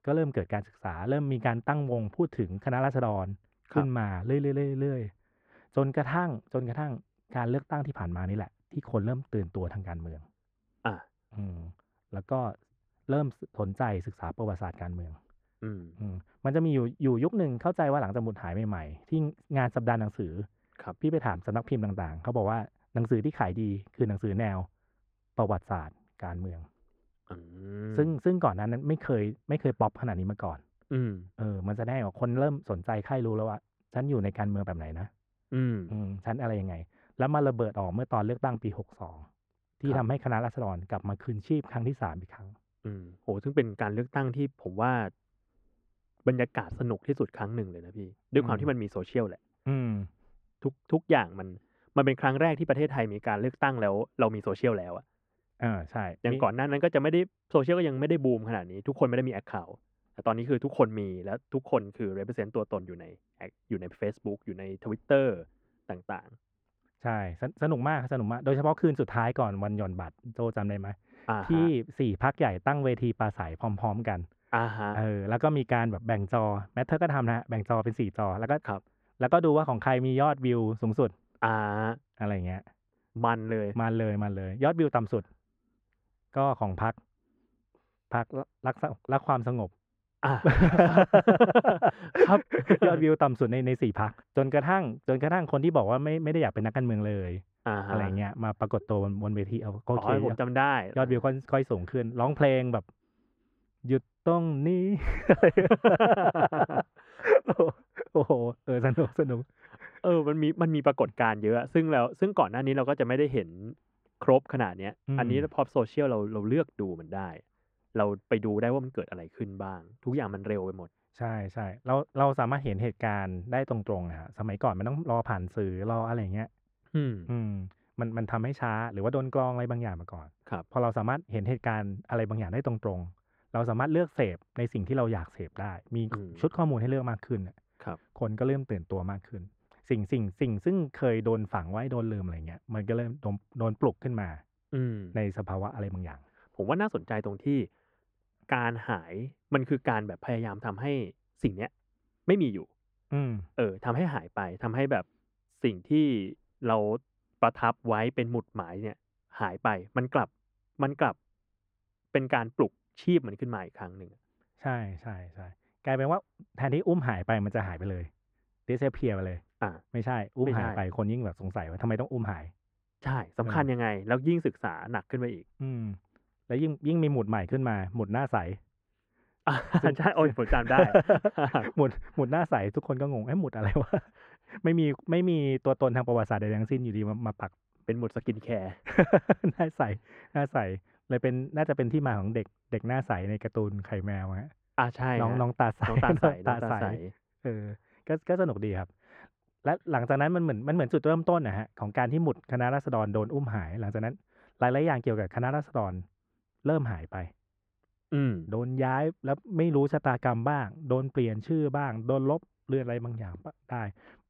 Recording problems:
muffled; very; fading above 4 kHz

